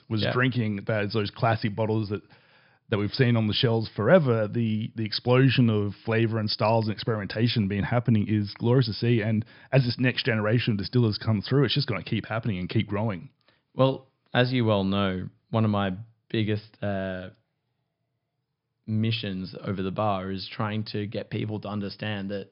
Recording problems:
high frequencies cut off; noticeable; nothing above 5.5 kHz

